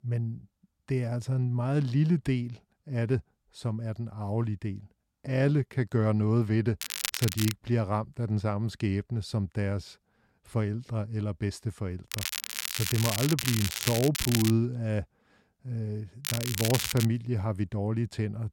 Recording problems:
crackling; loud; at 7 s, from 12 to 15 s and at 16 s; 2 dB below the speech

